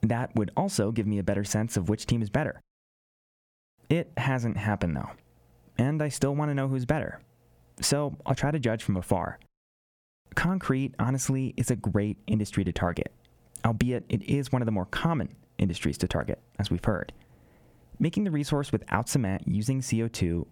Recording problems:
squashed, flat; somewhat

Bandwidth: 19 kHz